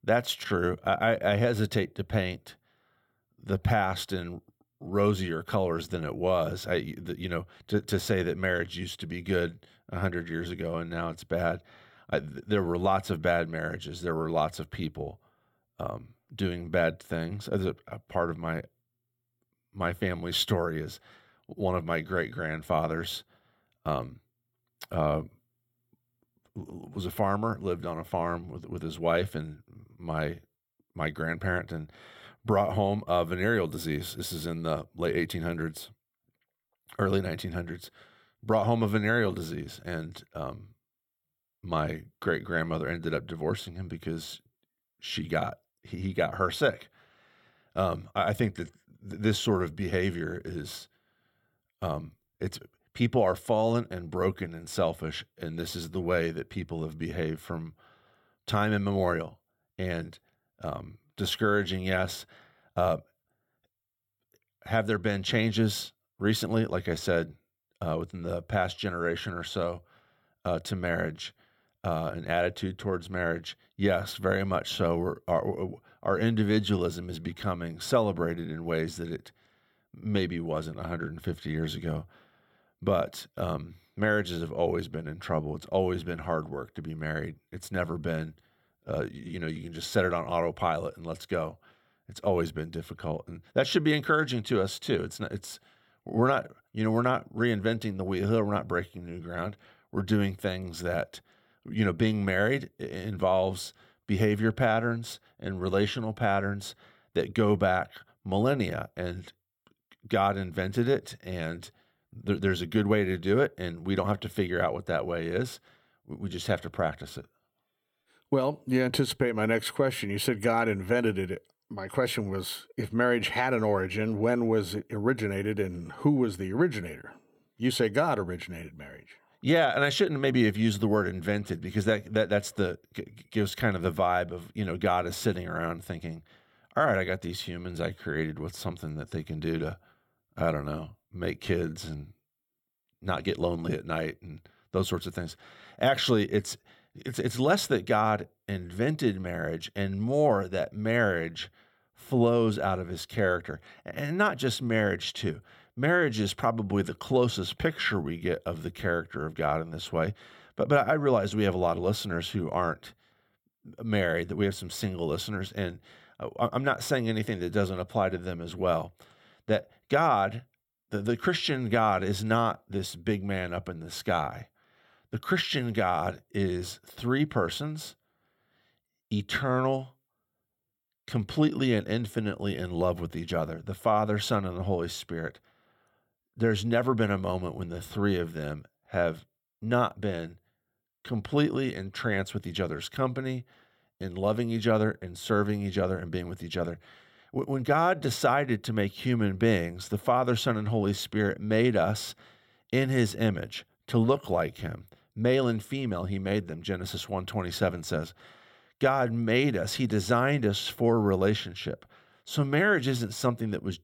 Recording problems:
none

